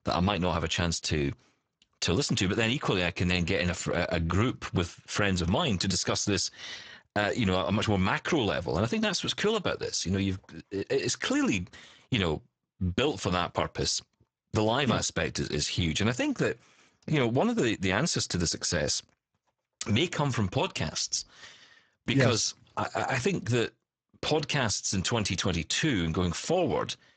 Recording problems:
garbled, watery; badly; nothing above 7.5 kHz

